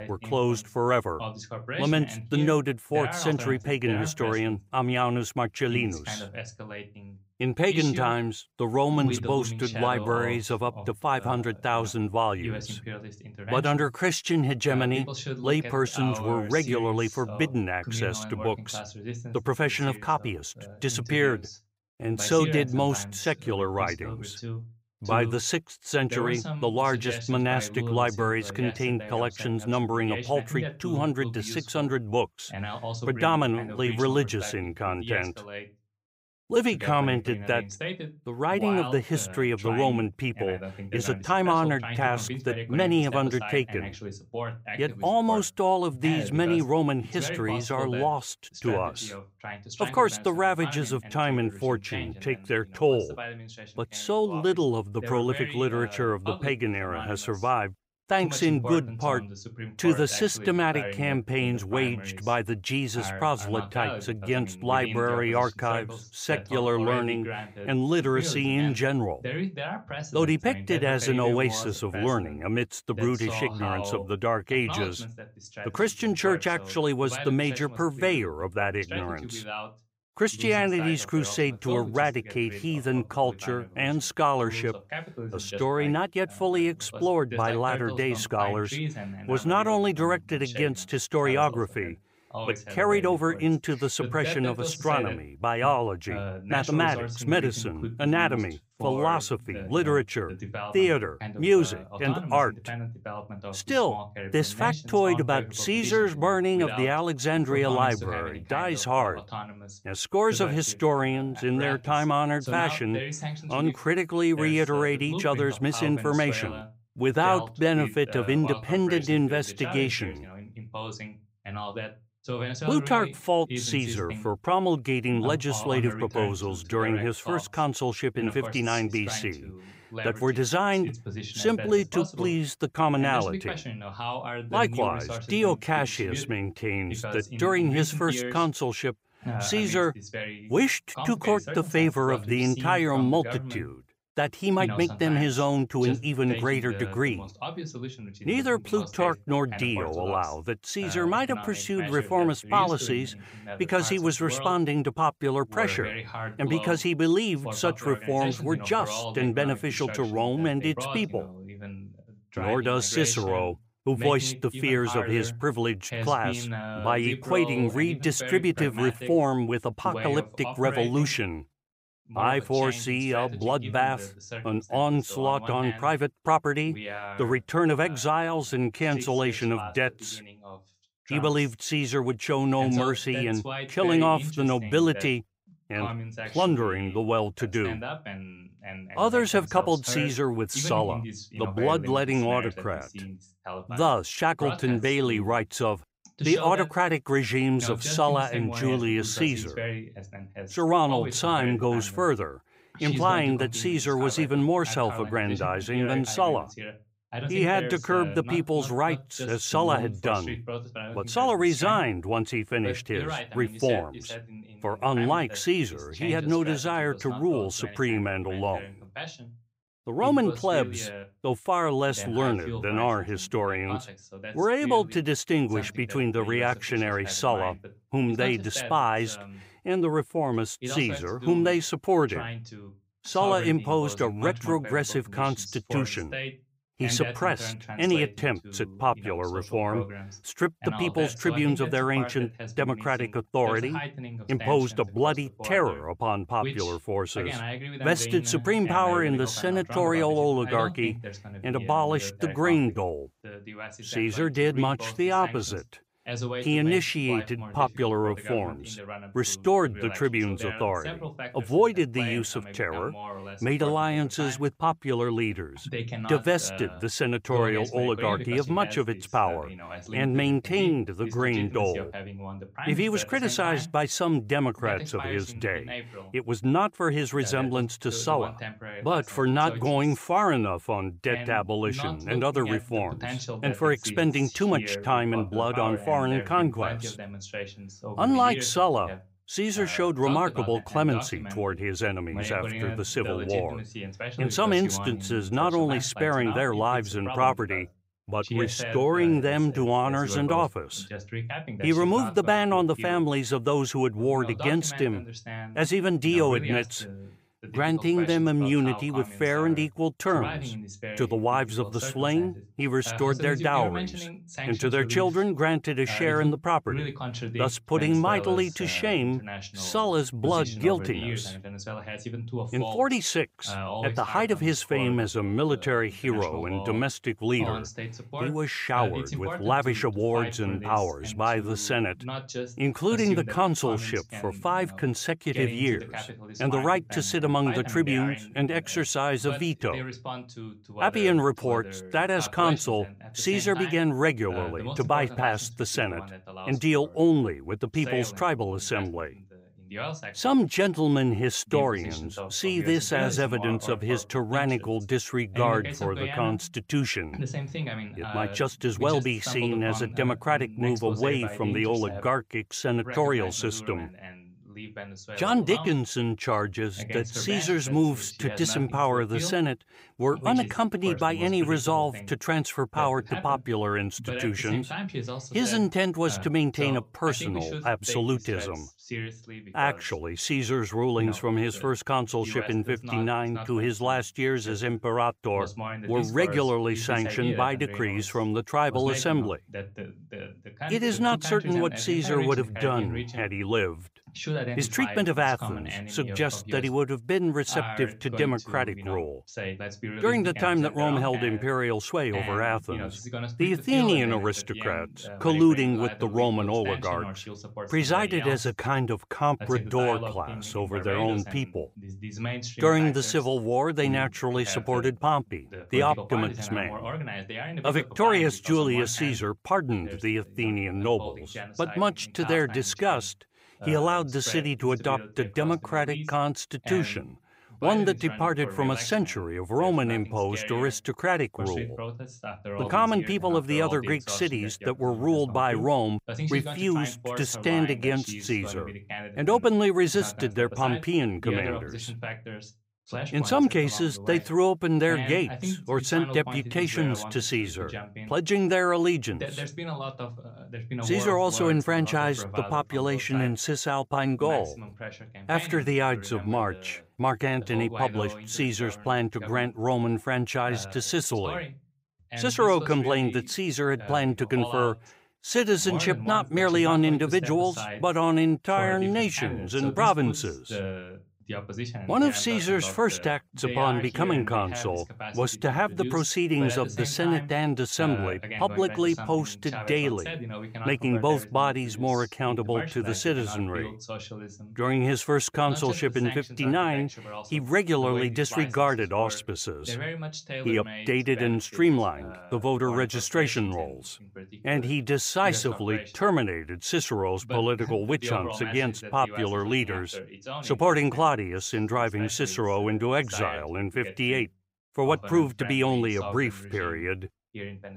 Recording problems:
voice in the background; noticeable; throughout; 10 dB below the speech

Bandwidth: 15.5 kHz